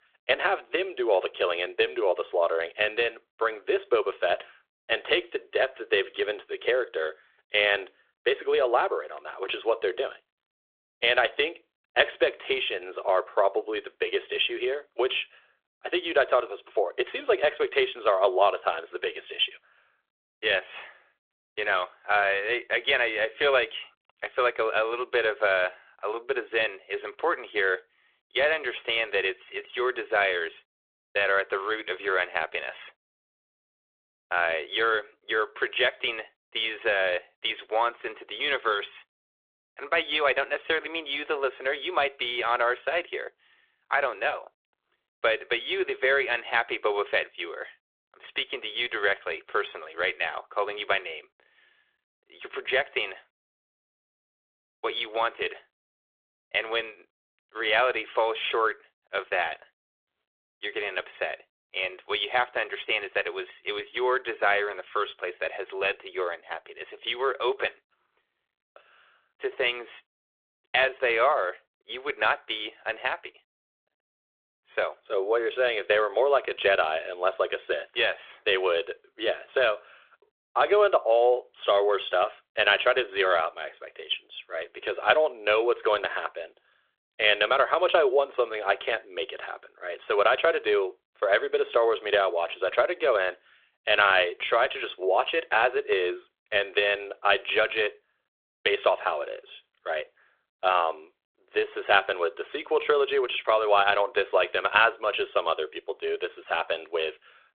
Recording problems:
phone-call audio; nothing above 3.5 kHz

